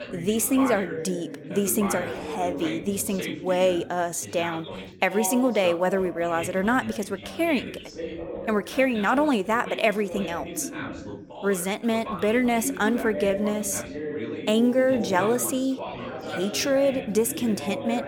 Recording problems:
background chatter; loud; throughout; 4 voices, 9 dB below the speech

